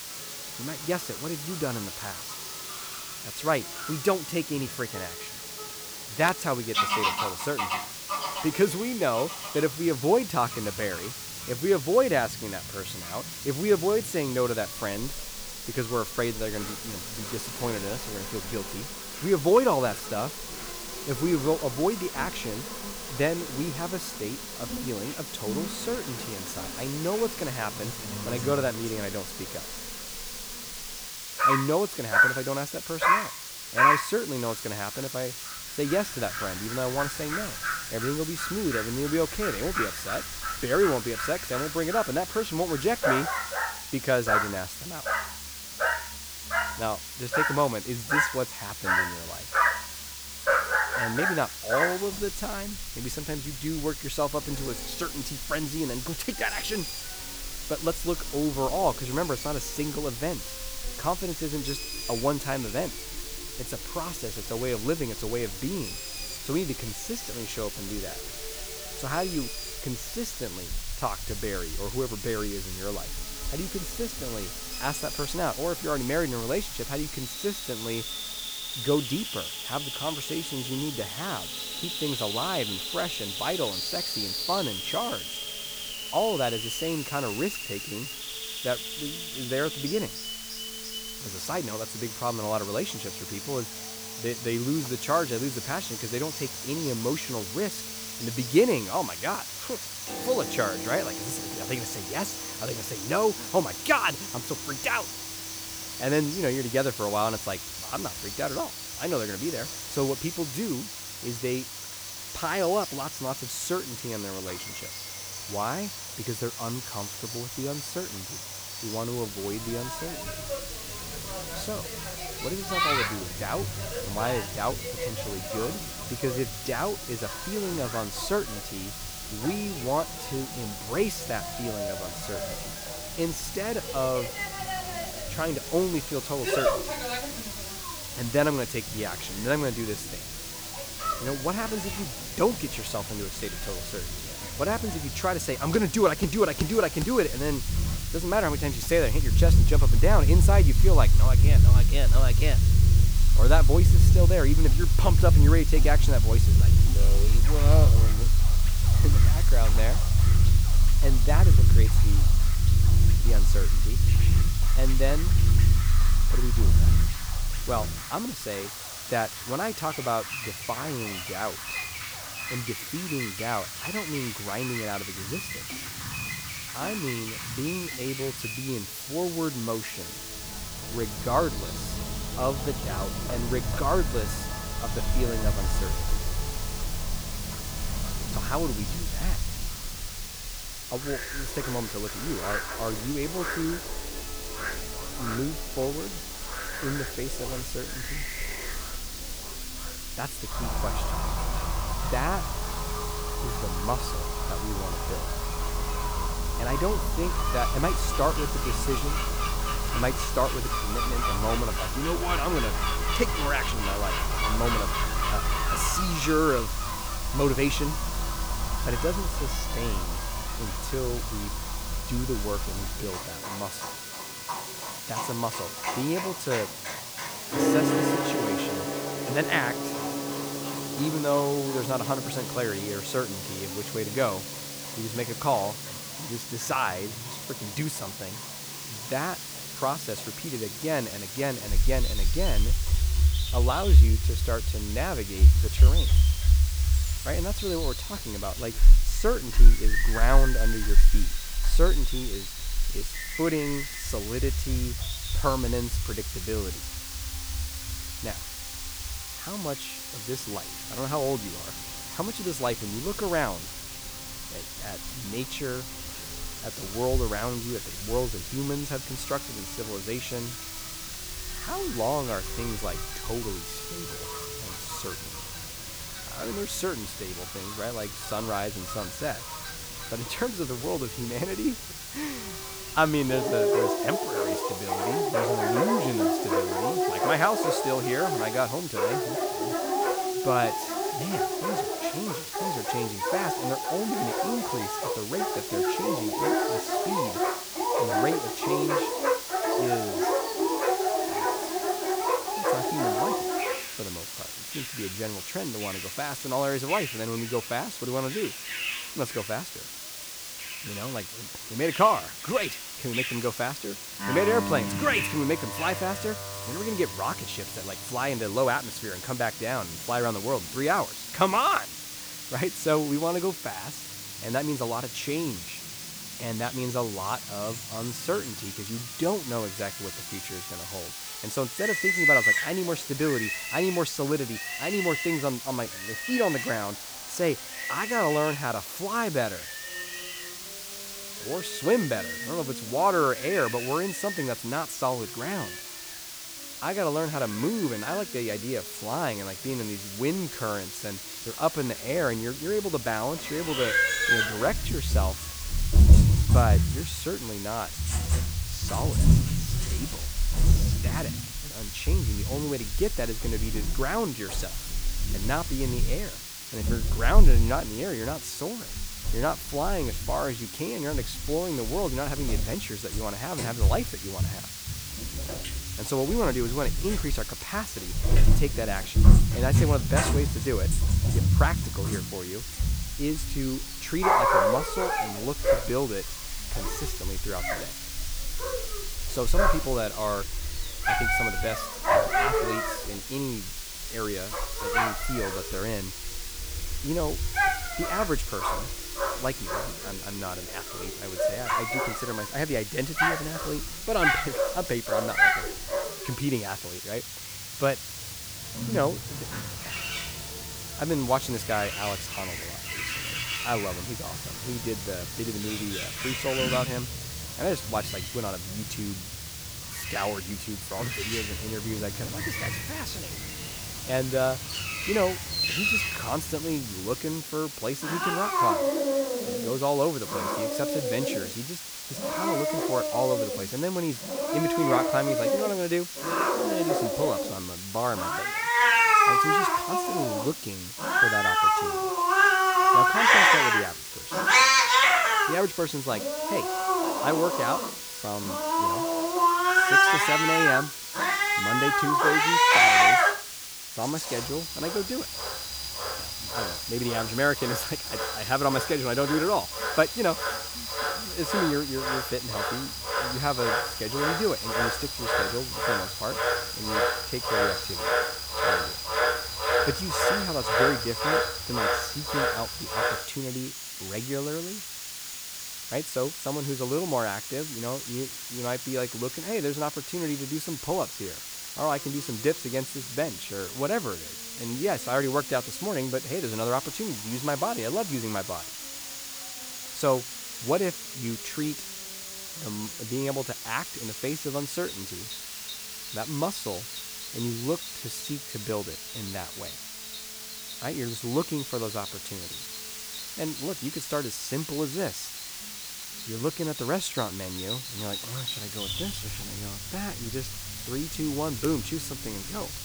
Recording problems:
animal sounds; very loud; throughout; 4 dB above the speech
hiss; loud; throughout; 5 dB below the speech
background music; noticeable; throughout; 15 dB below the speech
crowd noise; faint; throughout; 30 dB below the speech
uneven, jittery; slightly; from 3:34 to 5:29

